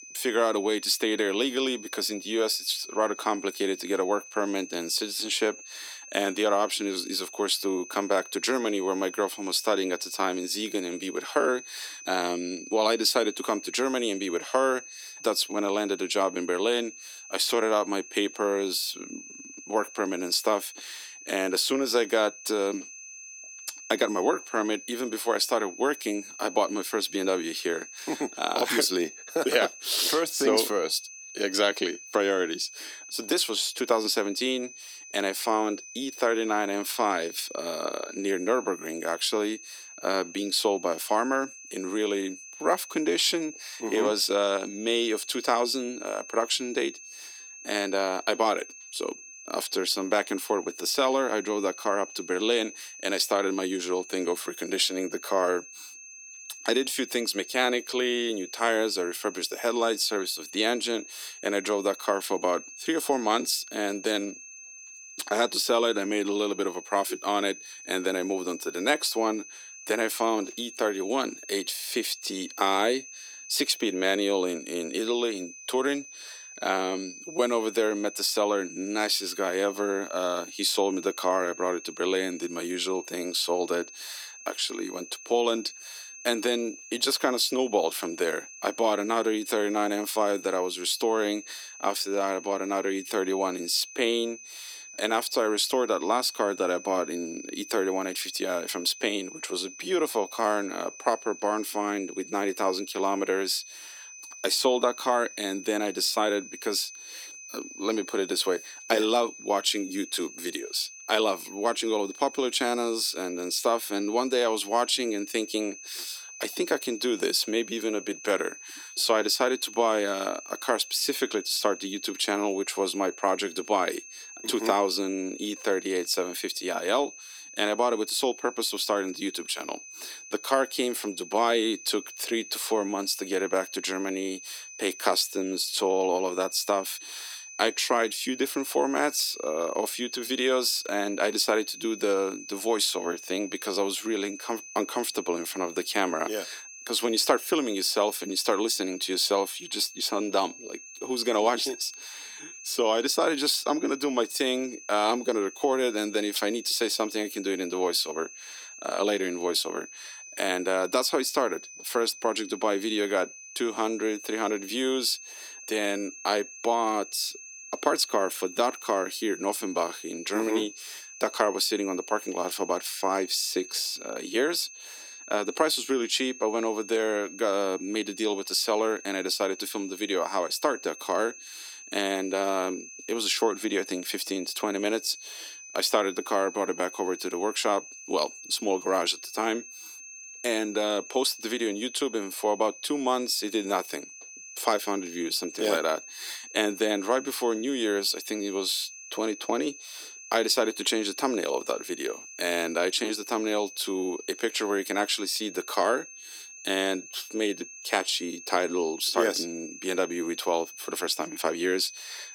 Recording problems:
thin; somewhat; fading below 300 Hz
high-pitched whine; noticeable; throughout; 6.5 kHz, 15 dB below the speech

